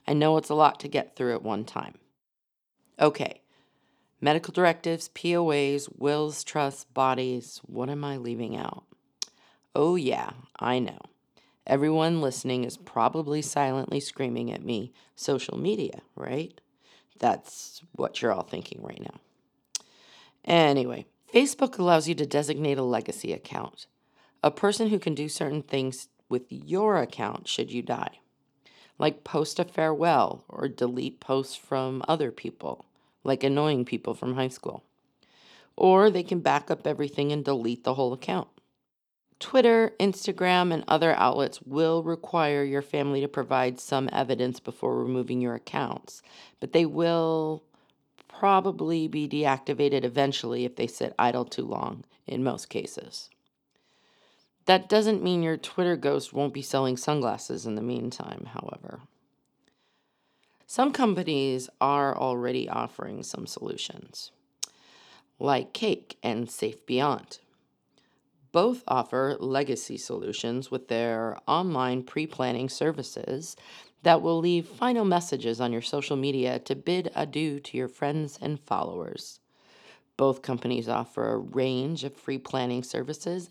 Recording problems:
none

